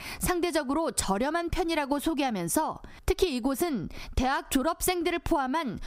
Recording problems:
squashed, flat; somewhat

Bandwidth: 15.5 kHz